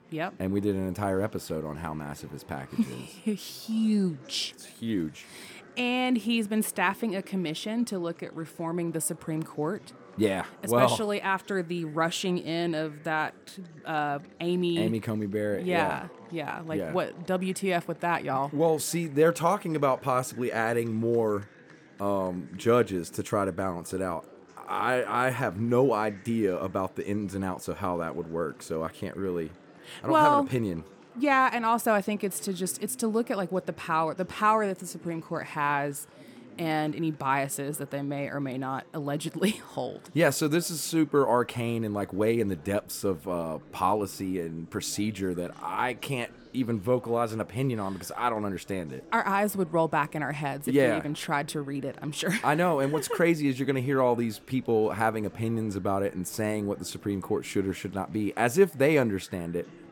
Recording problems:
chatter from many people; faint; throughout; 25 dB below the speech

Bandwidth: 18 kHz